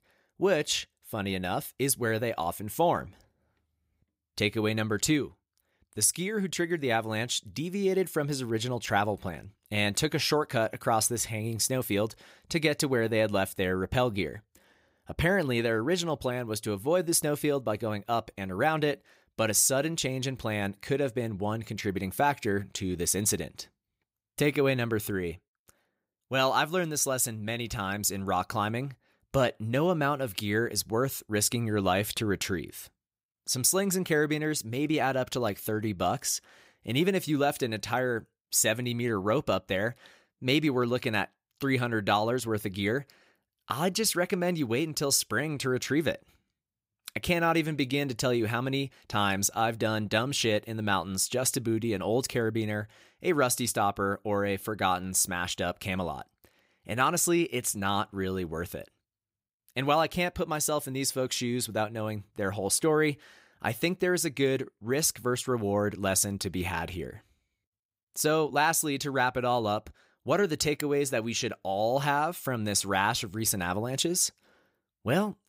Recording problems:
none

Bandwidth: 15.5 kHz